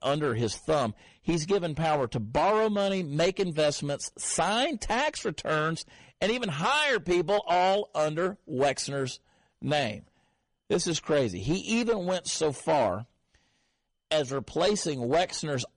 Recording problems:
distortion; slight; 7% of the sound clipped
garbled, watery; slightly; nothing above 10 kHz

